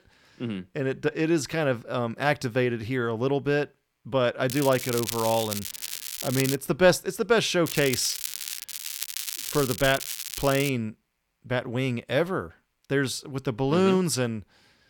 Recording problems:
crackling; loud; from 4.5 to 6.5 s and from 7.5 to 11 s; 6 dB below the speech

